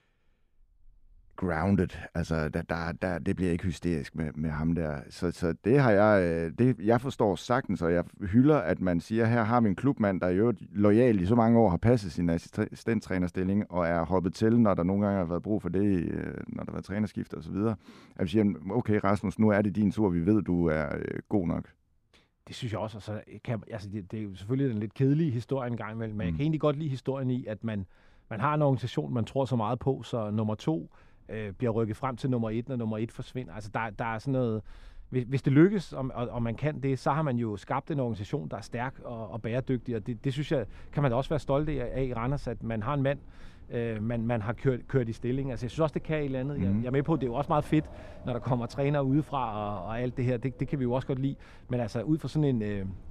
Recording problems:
wind in the background; faint; throughout; 25 dB below the speech

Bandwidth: 14 kHz